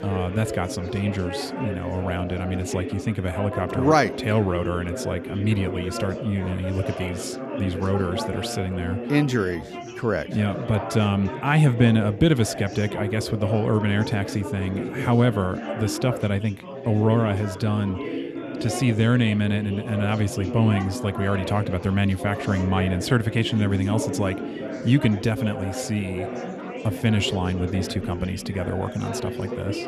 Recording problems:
chatter from many people; loud; throughout; 8 dB below the speech

